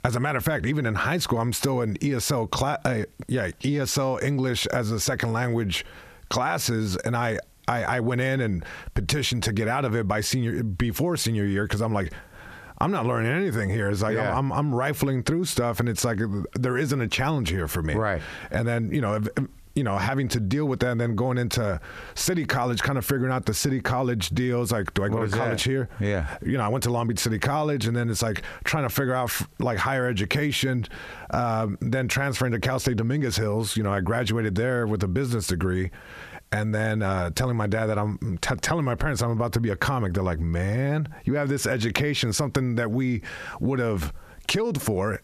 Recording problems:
squashed, flat; heavily

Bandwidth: 14.5 kHz